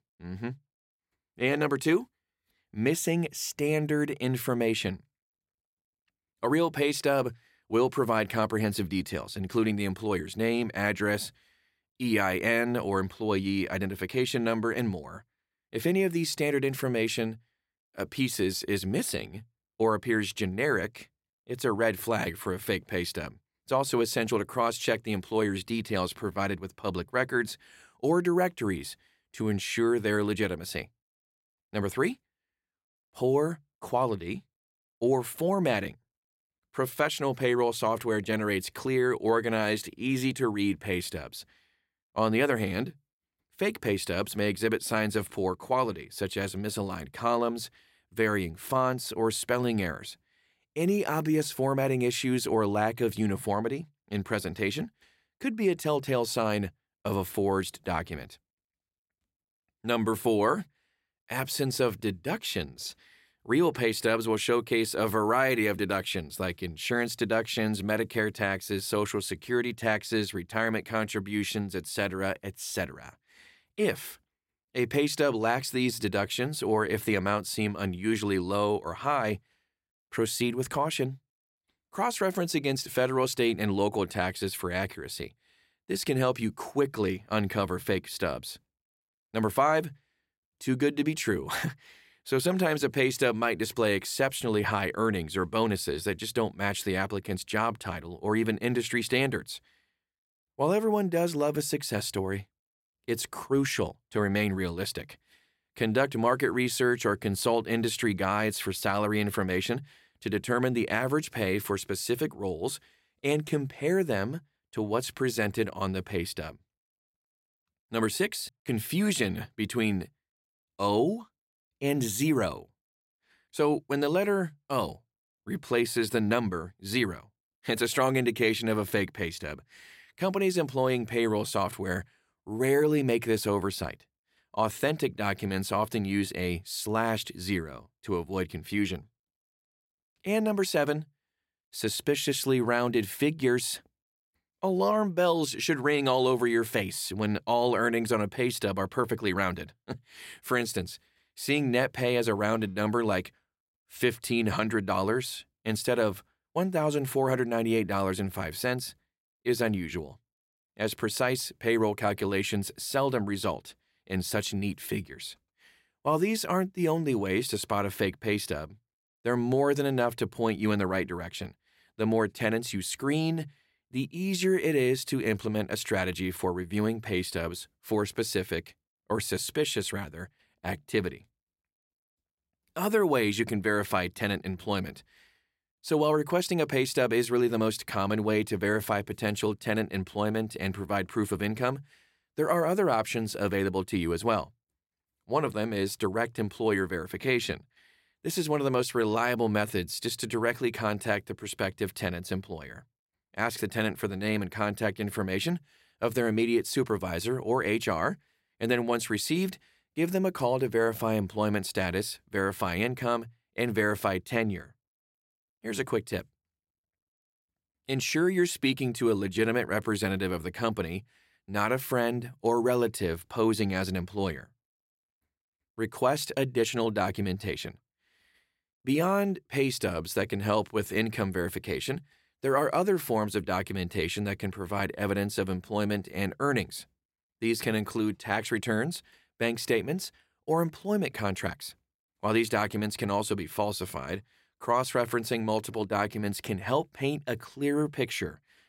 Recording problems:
none

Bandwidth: 16 kHz